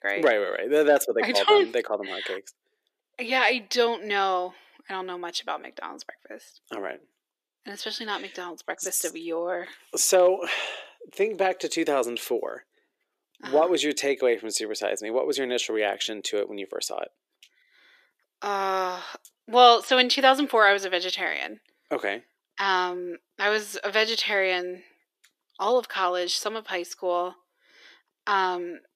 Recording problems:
thin; somewhat; fading below 350 Hz

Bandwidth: 14.5 kHz